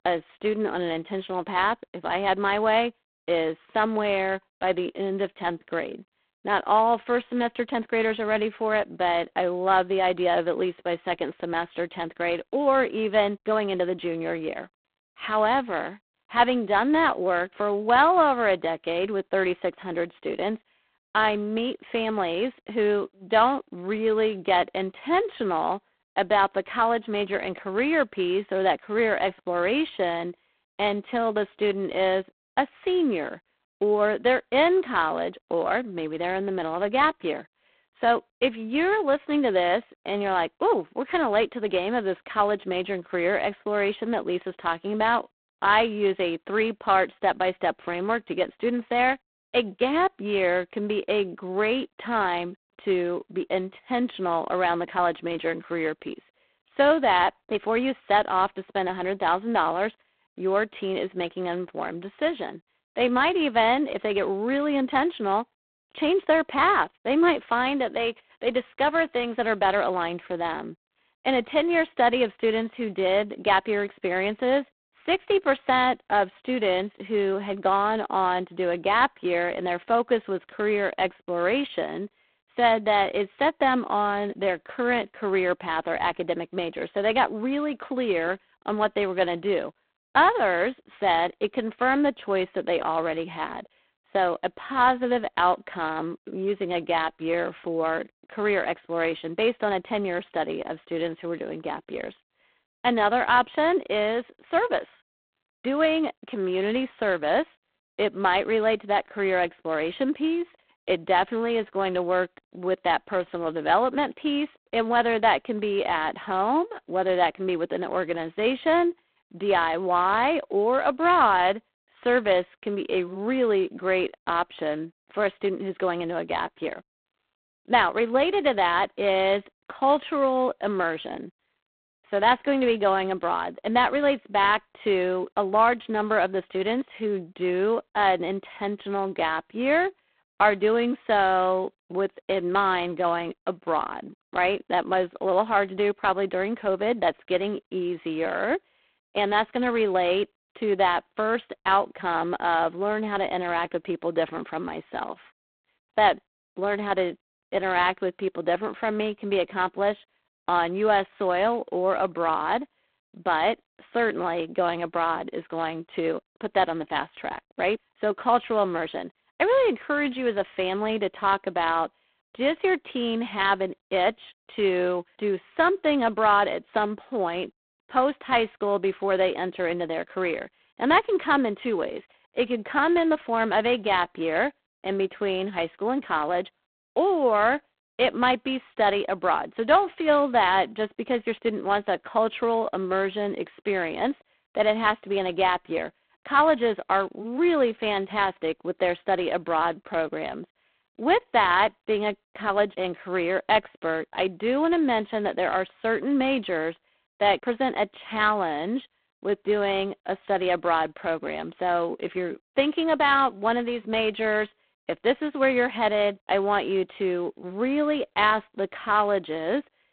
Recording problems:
phone-call audio; poor line; nothing above 3.5 kHz

